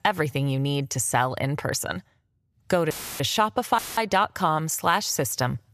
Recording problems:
audio cutting out; filled with static; at 3 s and at 4 s

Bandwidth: 14.5 kHz